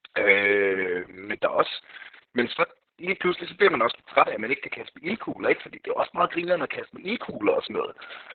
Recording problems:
garbled, watery; badly; nothing above 4 kHz
thin; somewhat; fading below 550 Hz

